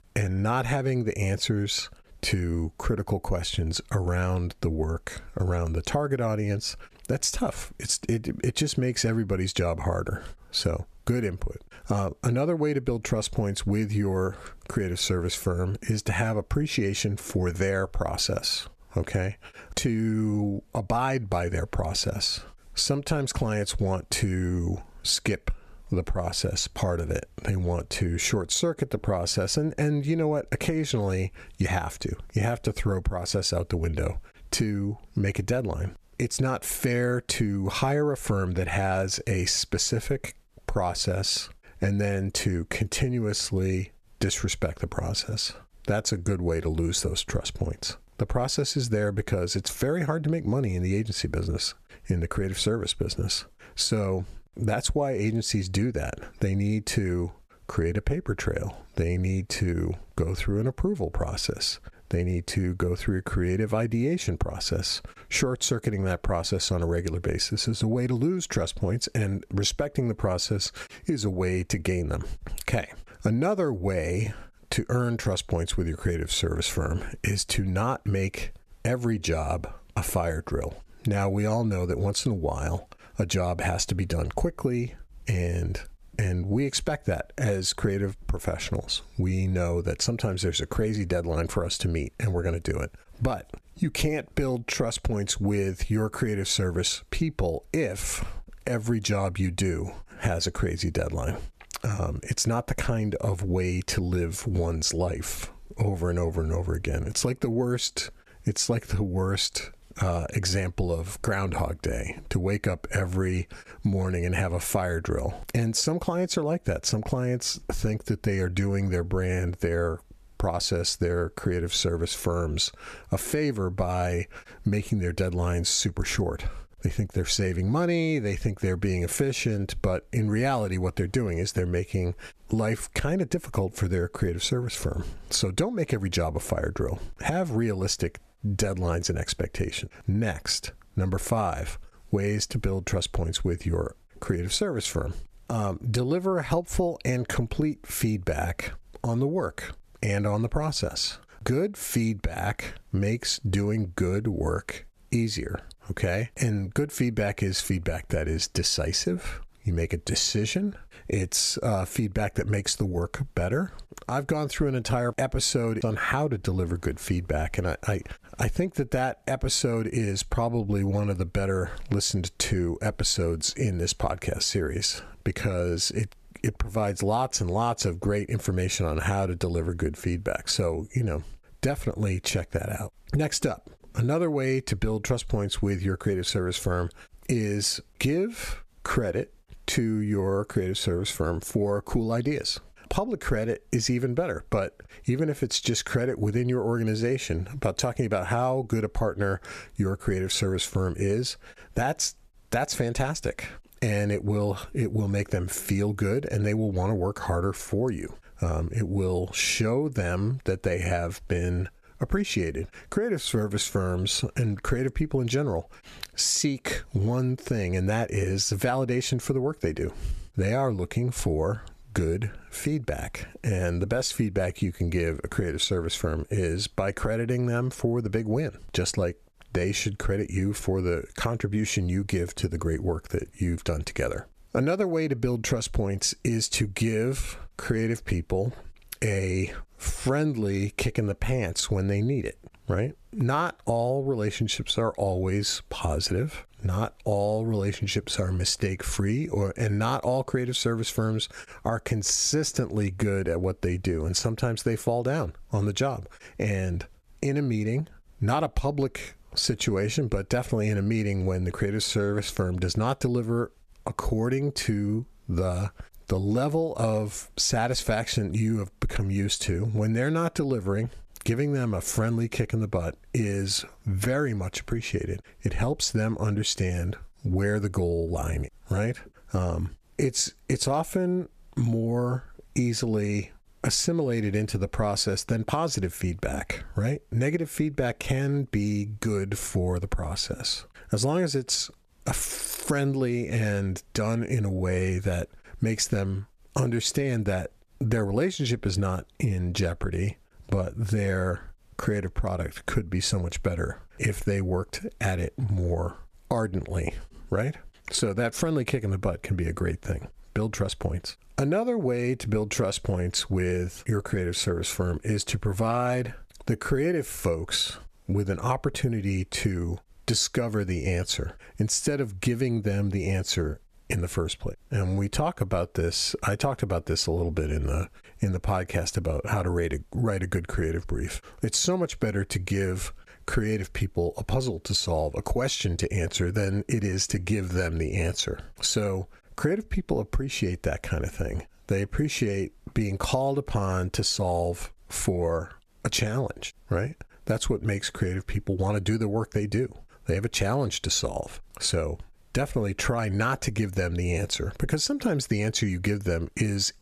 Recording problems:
squashed, flat; somewhat

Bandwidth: 14.5 kHz